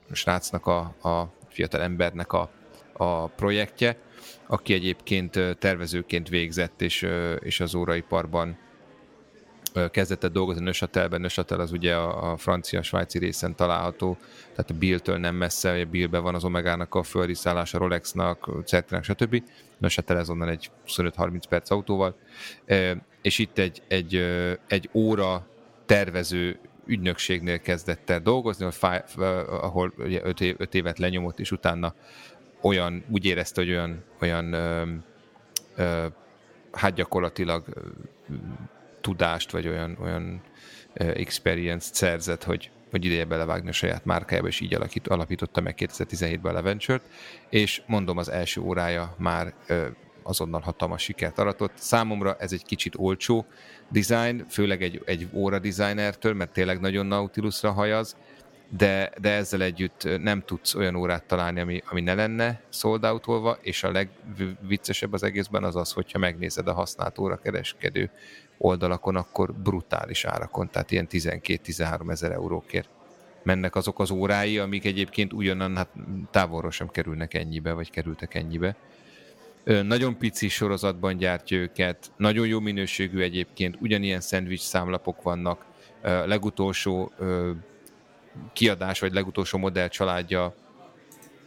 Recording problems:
murmuring crowd; faint; throughout; 25 dB below the speech

